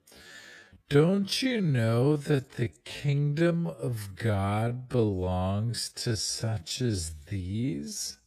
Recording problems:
wrong speed, natural pitch; too slow; 0.5 times normal speed

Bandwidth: 14.5 kHz